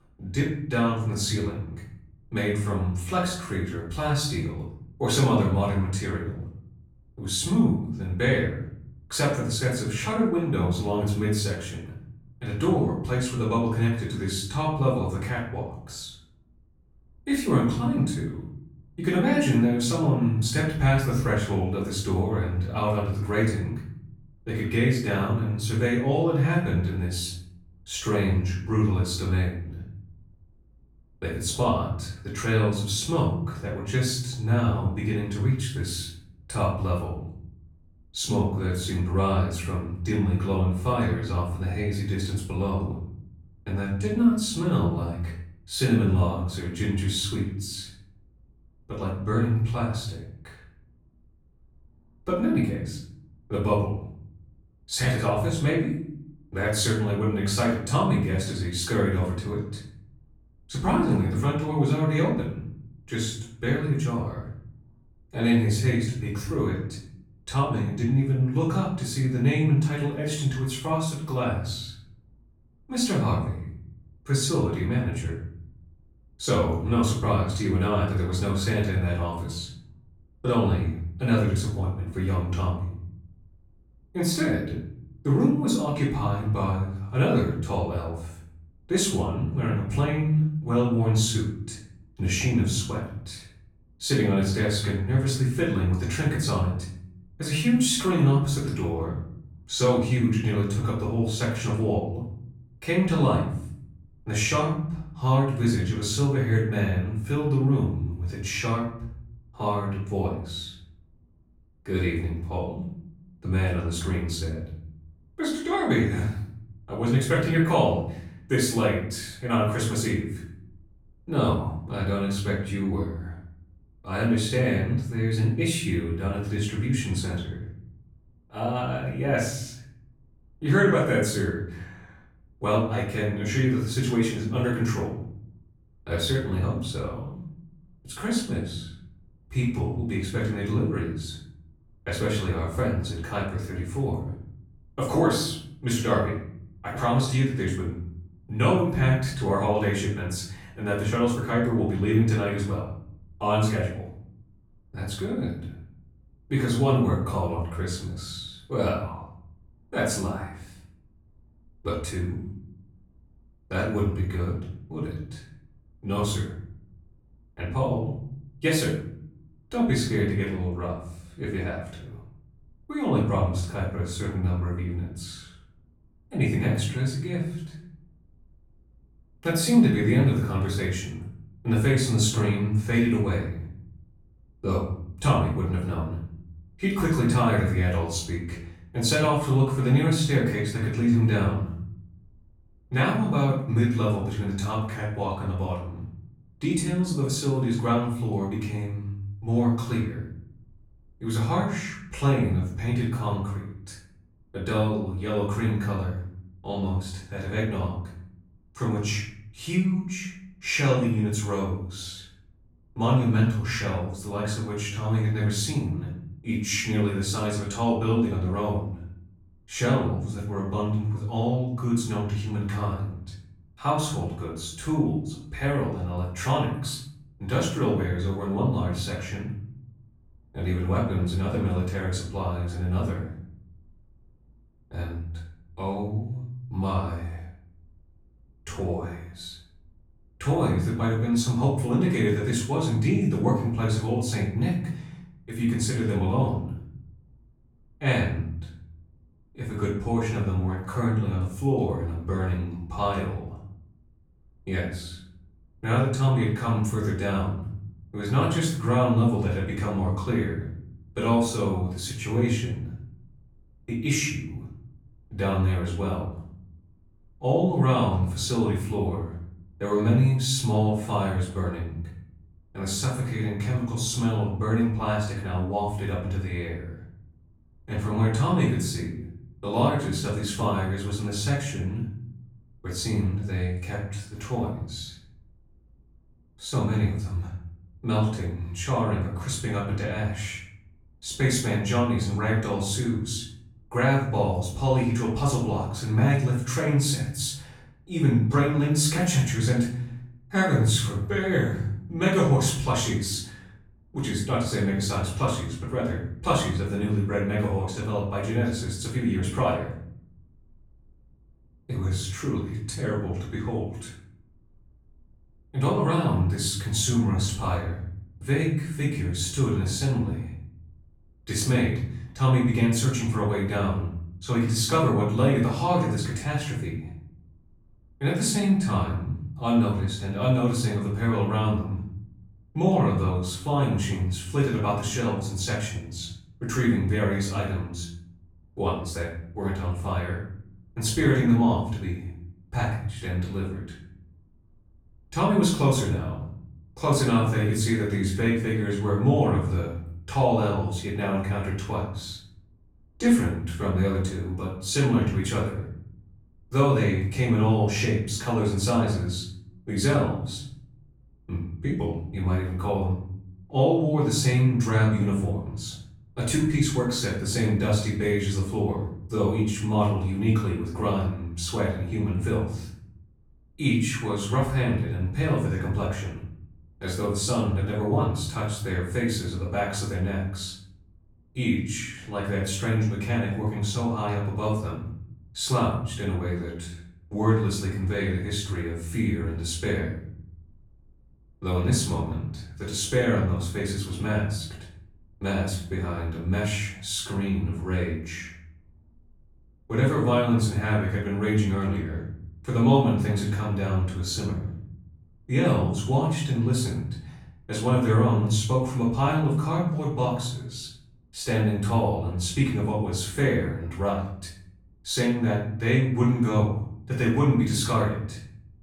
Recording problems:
off-mic speech; far
room echo; noticeable; dies away in 0.7 s

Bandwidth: 18.5 kHz